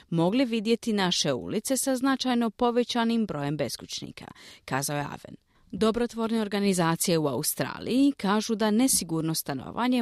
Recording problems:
abrupt cut into speech; at the end

